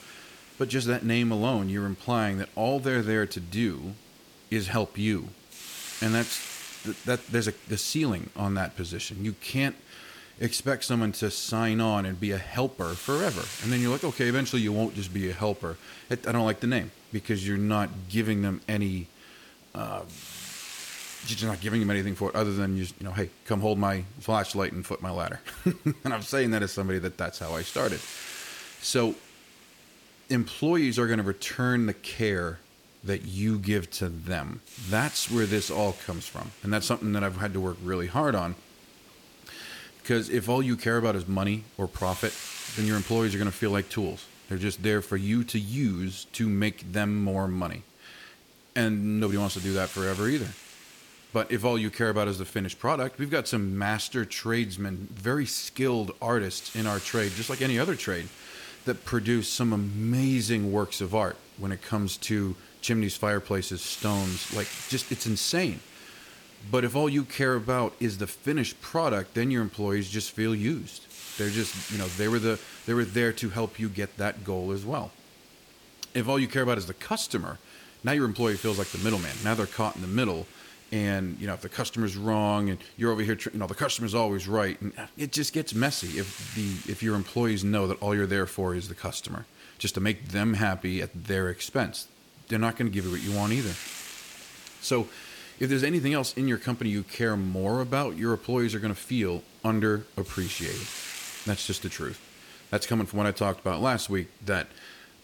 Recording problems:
hiss; noticeable; throughout; 15 dB below the speech

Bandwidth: 17.5 kHz